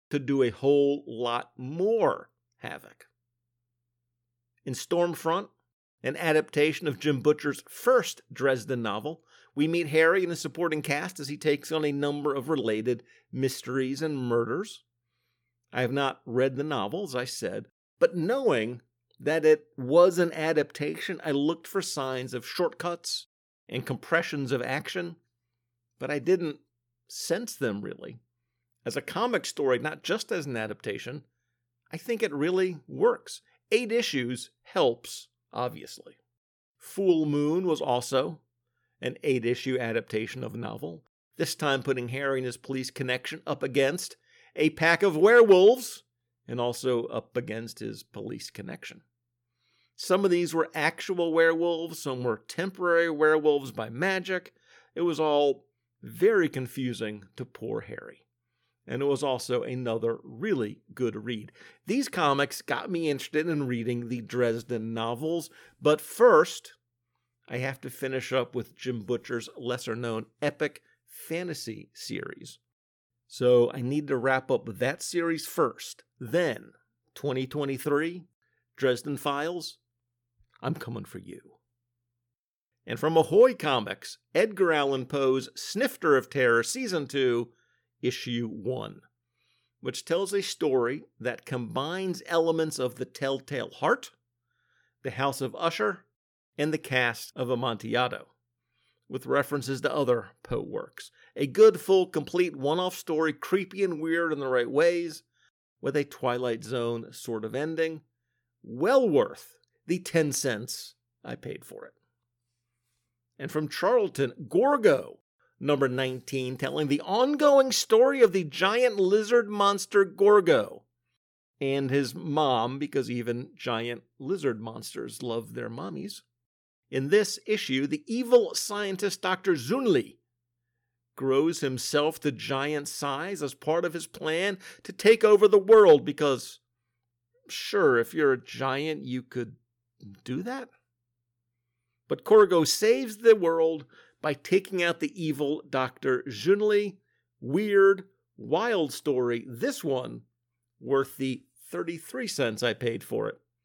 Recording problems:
none

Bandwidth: 18 kHz